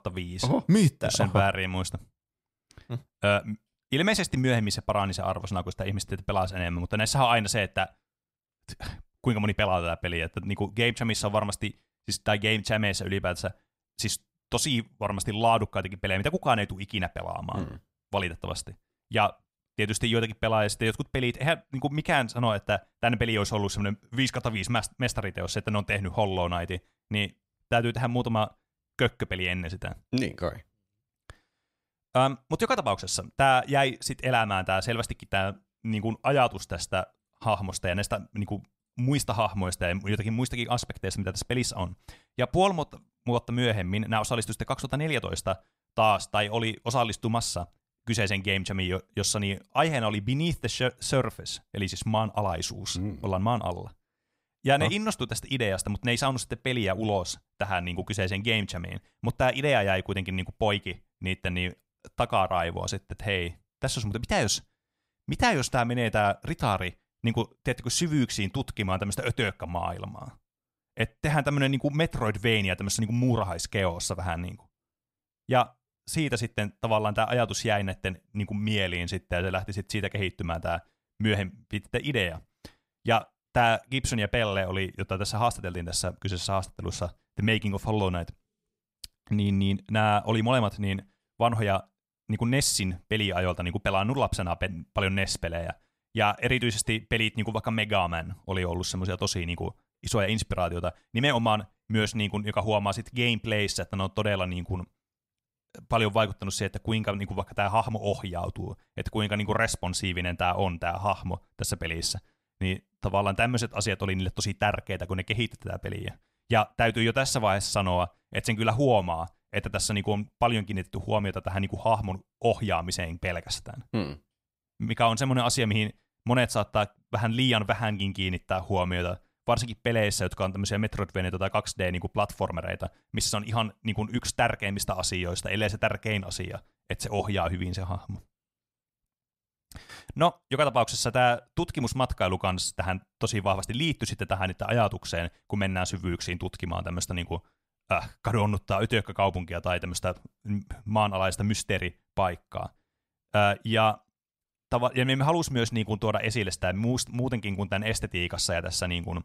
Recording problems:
none

